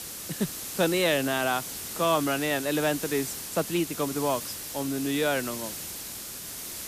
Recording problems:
hiss; loud; throughout; 7 dB below the speech
uneven, jittery; strongly; from 0.5 to 5.5 s

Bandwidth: 14.5 kHz